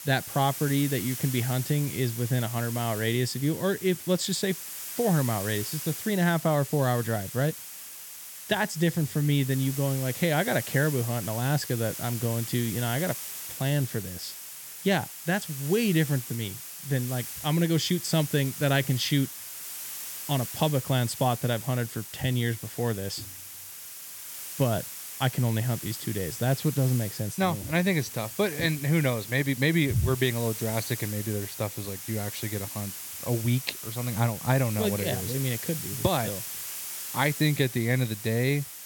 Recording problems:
hiss; loud; throughout; 8 dB below the speech

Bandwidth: 17 kHz